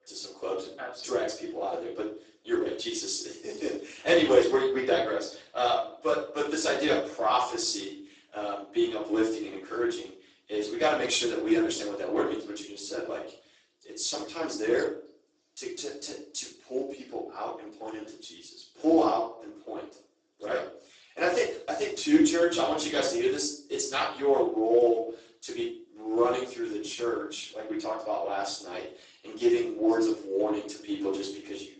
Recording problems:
off-mic speech; far
garbled, watery; badly; nothing above 8 kHz
room echo; noticeable; dies away in 0.4 s
thin; very slightly; fading below 300 Hz

